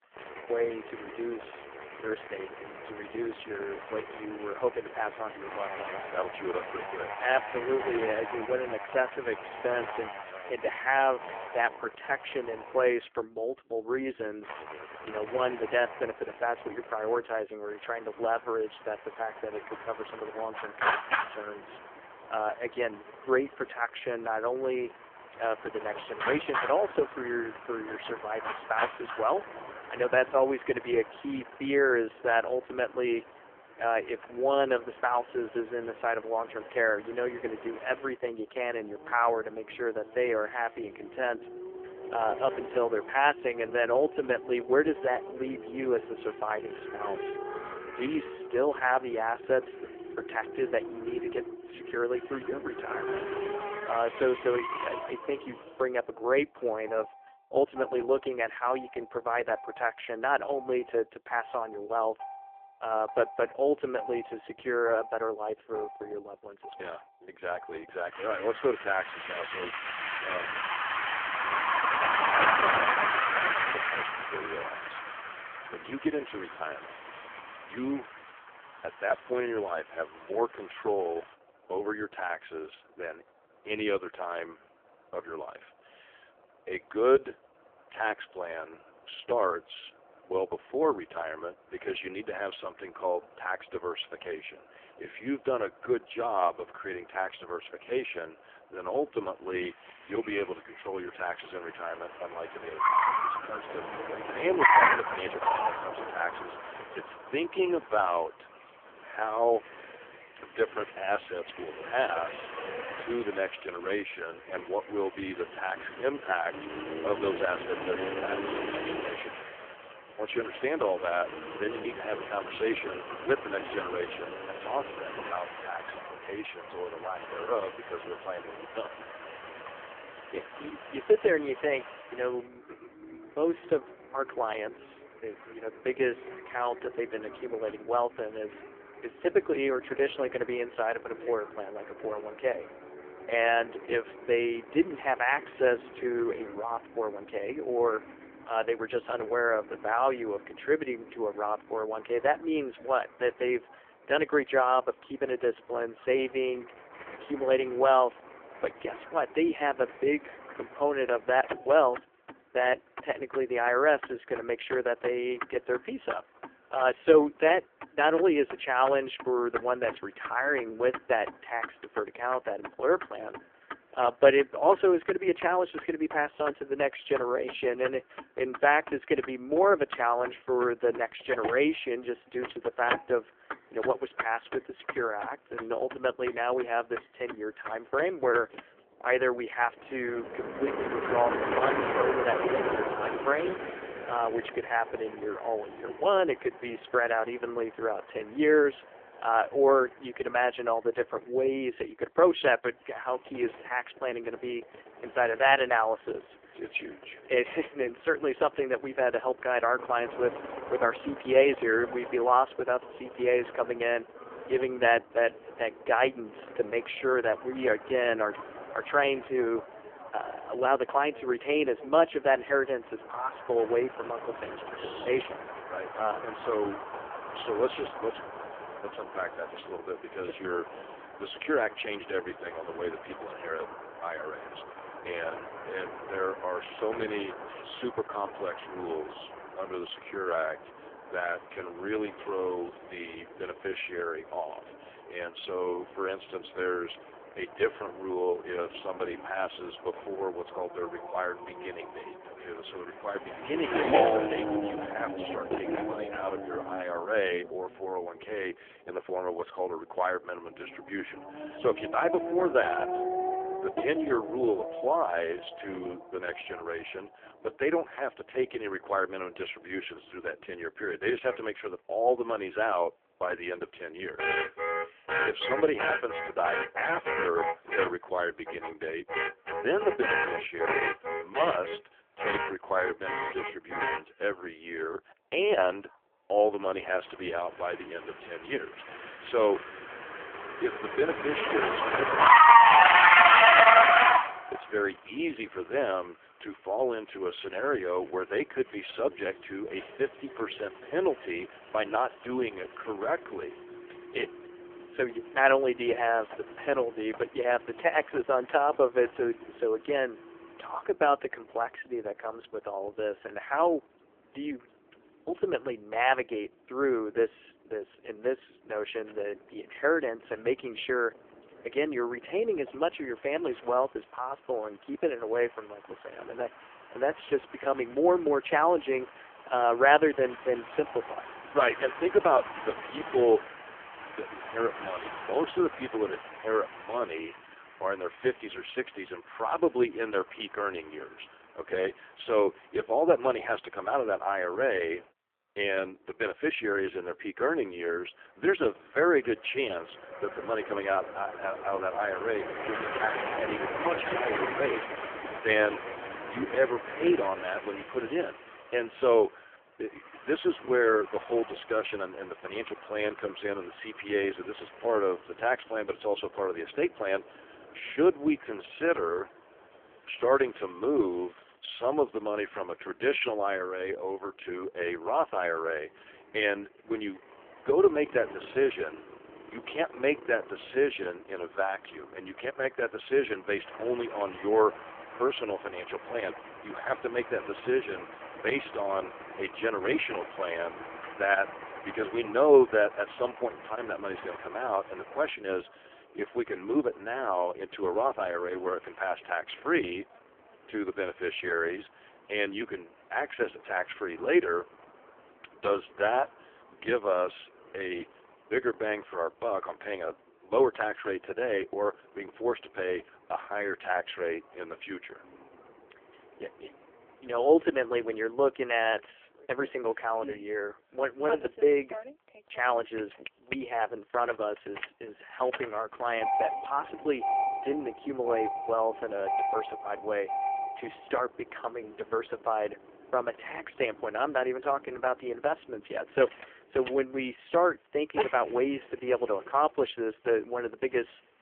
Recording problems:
phone-call audio; poor line; nothing above 3.5 kHz
traffic noise; loud; throughout; 1 dB below the speech

